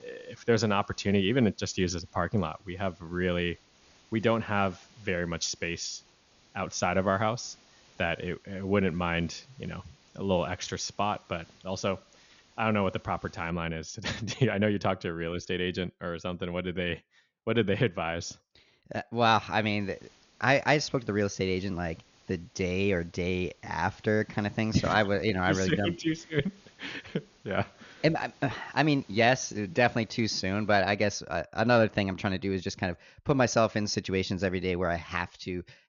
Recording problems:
high frequencies cut off; noticeable; nothing above 7 kHz
hiss; faint; until 14 s and from 20 to 31 s; 30 dB below the speech

